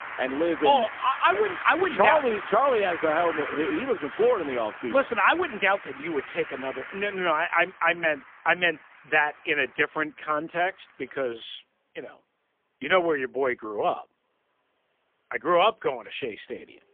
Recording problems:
phone-call audio; poor line; nothing above 3.5 kHz
traffic noise; noticeable; throughout; 10 dB below the speech

